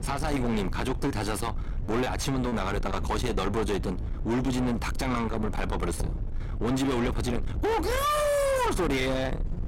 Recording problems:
distortion; heavy; 6 dB below the speech
low rumble; loud; throughout; 10 dB below the speech
choppy; very; from 1 to 2.5 s; 6% of the speech affected
door banging; noticeable; at 6 s; peak 7 dB below the speech

